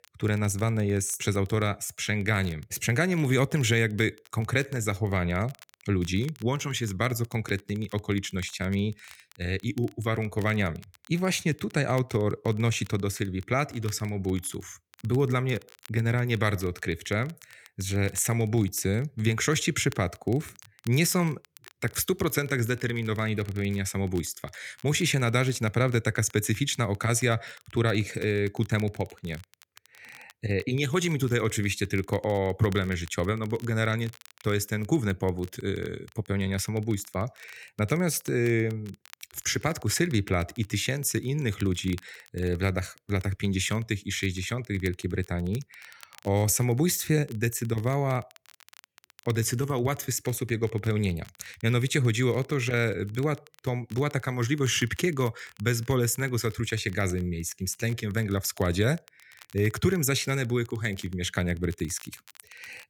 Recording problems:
crackle, like an old record; faint; 25 dB below the speech

